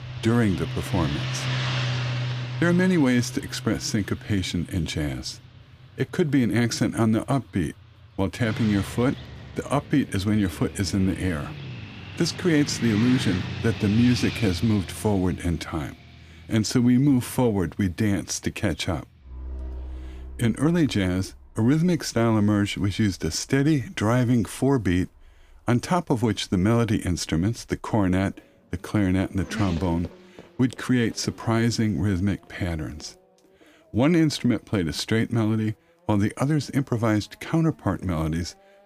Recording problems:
traffic noise; loud; throughout; 10 dB below the speech

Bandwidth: 15 kHz